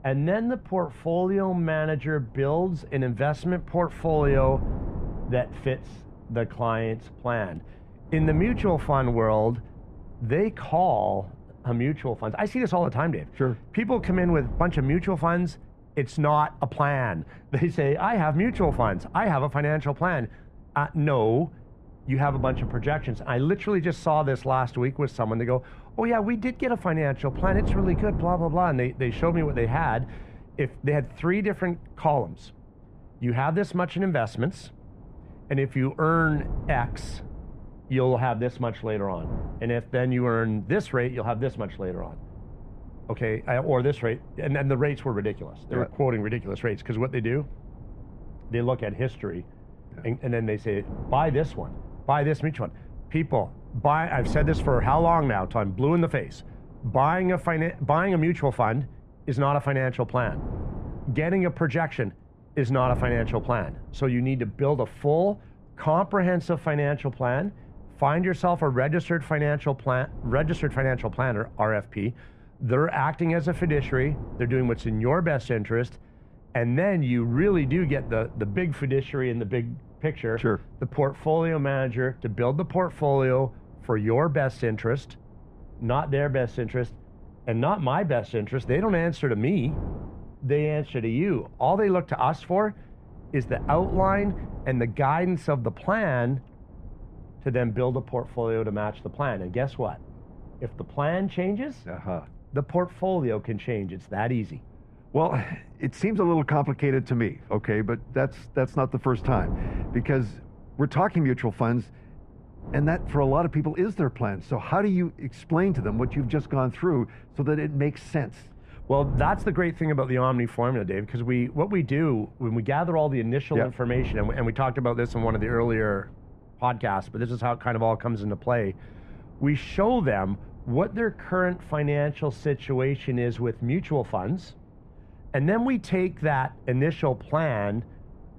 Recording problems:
muffled; very; fading above 3 kHz
wind noise on the microphone; occasional gusts; 20 dB below the speech

